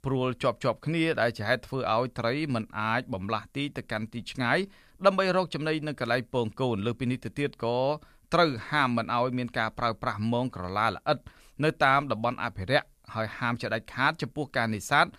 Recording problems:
none

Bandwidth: 15 kHz